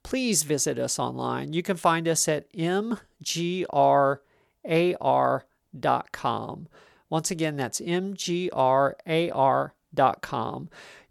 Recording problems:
none

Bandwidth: 18 kHz